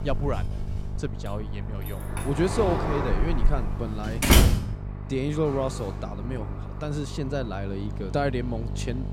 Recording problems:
household noises; very loud; throughout; 4 dB above the speech
traffic noise; loud; throughout; 6 dB below the speech
electrical hum; noticeable; throughout; 50 Hz, 15 dB below the speech

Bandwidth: 16 kHz